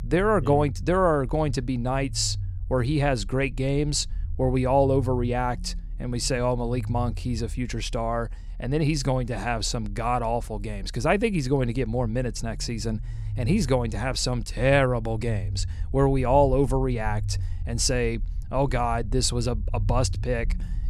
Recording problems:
low rumble; faint; throughout; 25 dB below the speech

